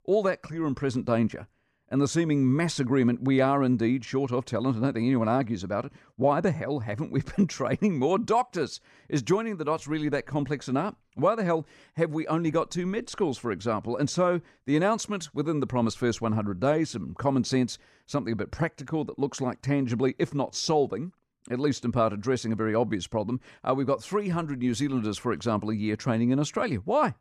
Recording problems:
none

